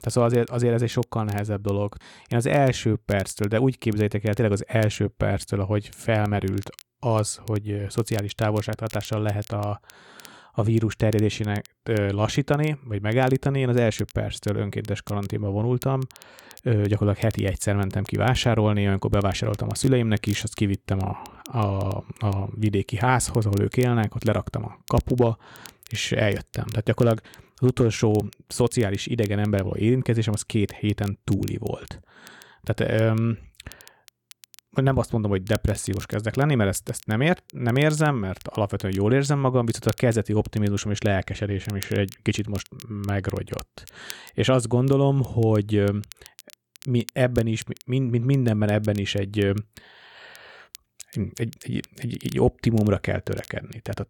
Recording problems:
crackle, like an old record; faint; 25 dB below the speech

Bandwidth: 17.5 kHz